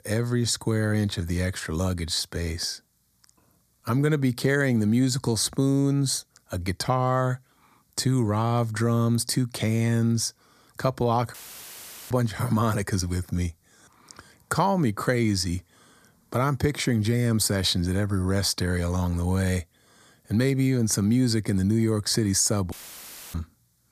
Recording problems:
audio cutting out; filled with static; at 11 s for 1 s and at 23 s for 0.5 s

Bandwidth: 14.5 kHz